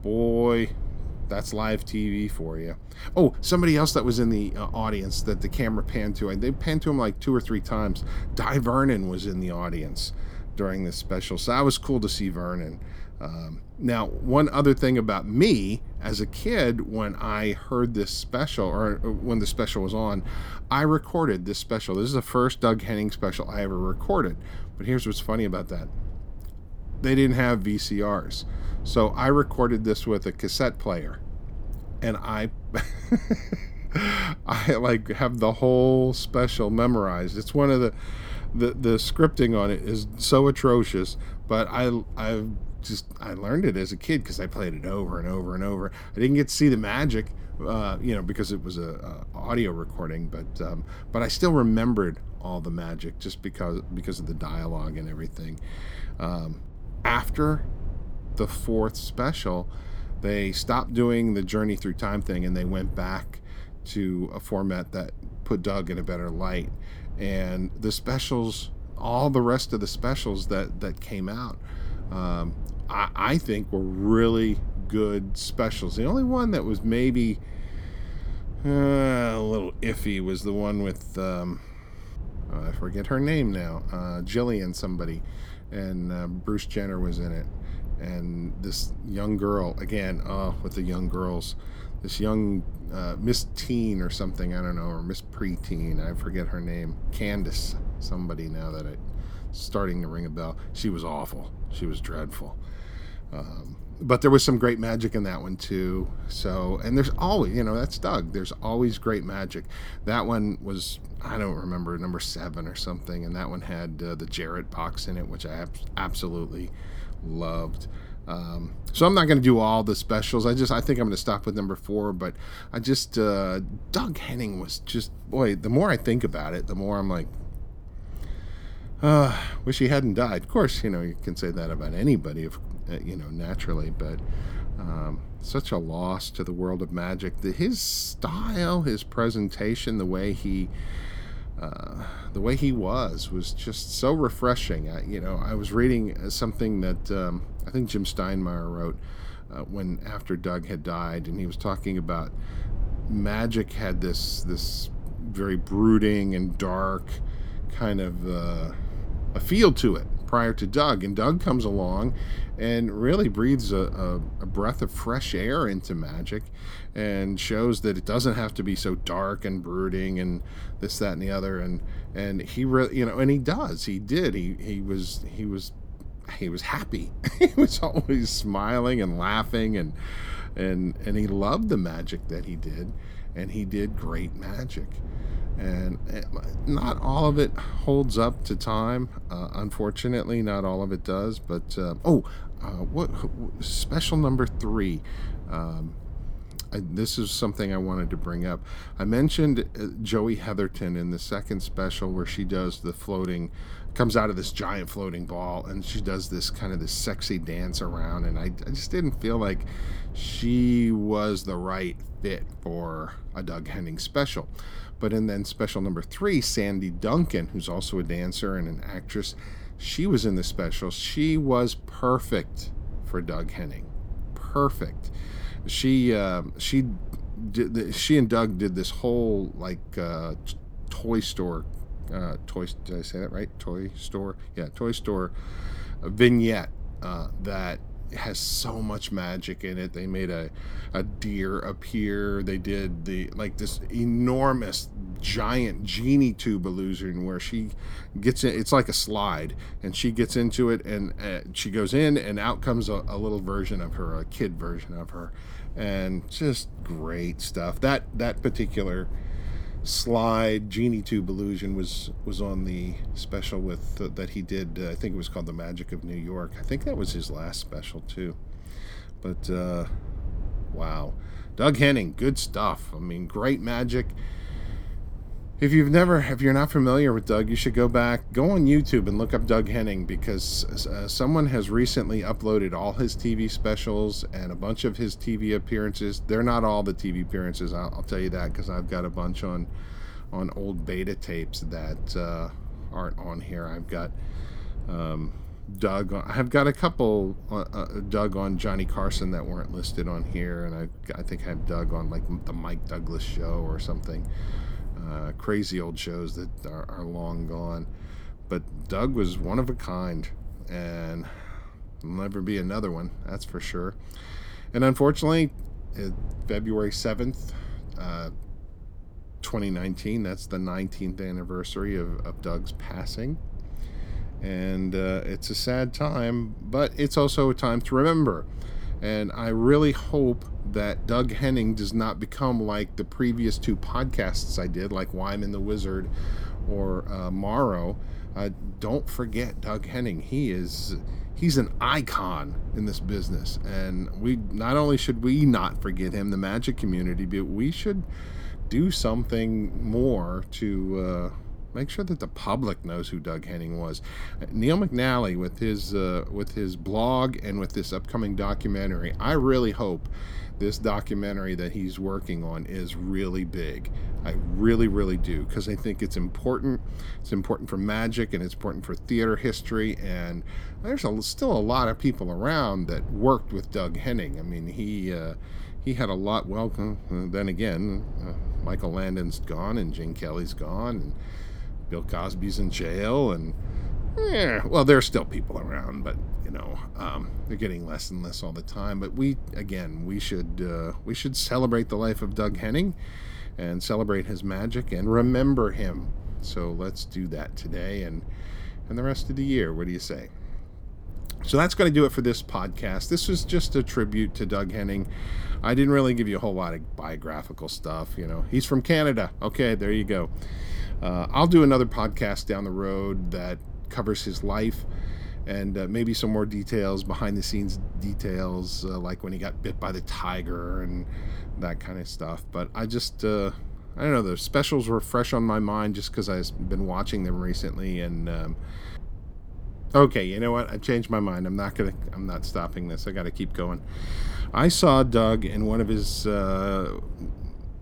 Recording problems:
low rumble; faint; throughout; 25 dB below the speech

